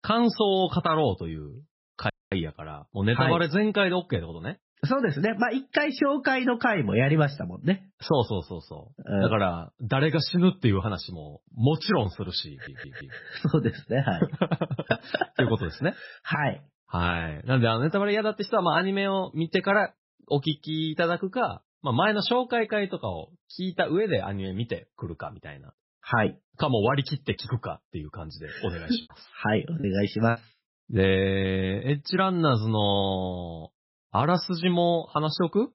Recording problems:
garbled, watery; badly; nothing above 5.5 kHz
audio cutting out; at 2 s
audio stuttering; at 13 s
choppy; very; at 30 s; 7% of the speech affected

